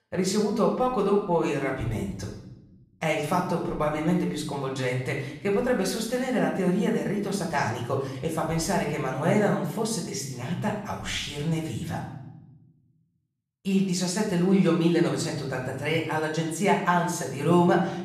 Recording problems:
off-mic speech; far
room echo; noticeable; dies away in 0.8 s

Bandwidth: 14.5 kHz